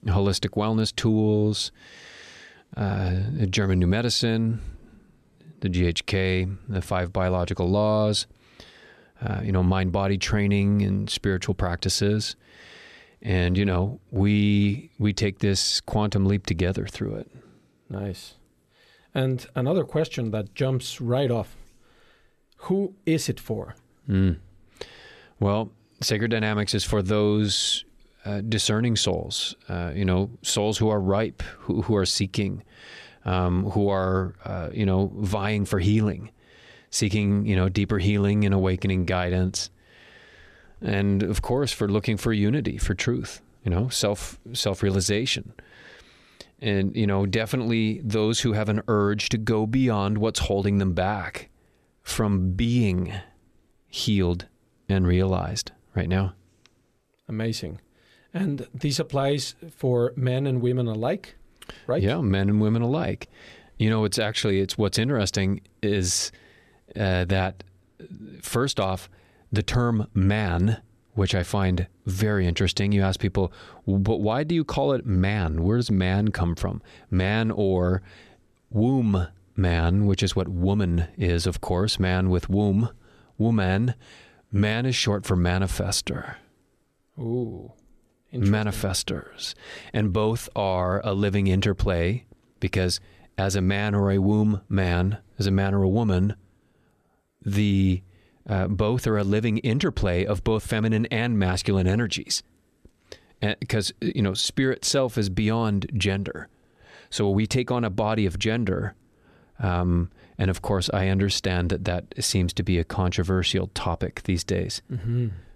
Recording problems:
none

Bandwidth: 13.5 kHz